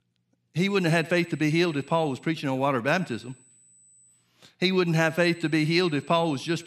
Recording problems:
echo of what is said; faint; throughout; 100 ms later, 25 dB below the speech
high-pitched whine; faint; from 1 to 2.5 s, from 3 to 4 s and from 5 s on; 8 kHz, 30 dB below the speech

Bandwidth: 14 kHz